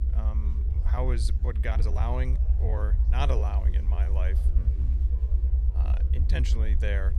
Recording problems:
low rumble; loud; throughout; 8 dB below the speech
chatter from many people; noticeable; throughout; 20 dB below the speech
uneven, jittery; strongly; from 0.5 to 6.5 s

